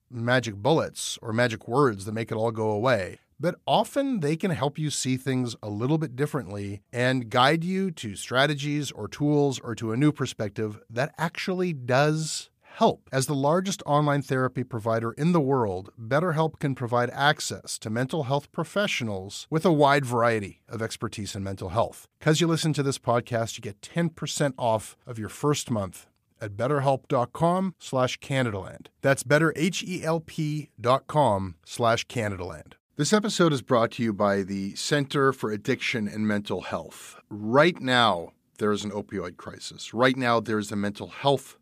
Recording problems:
none

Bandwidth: 15 kHz